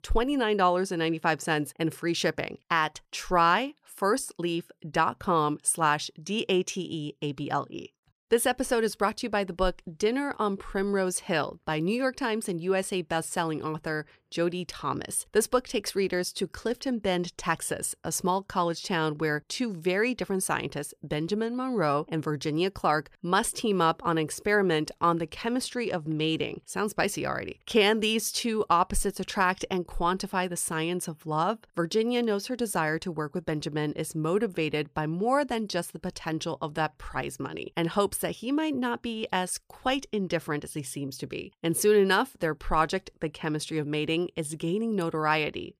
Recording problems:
none

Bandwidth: 15 kHz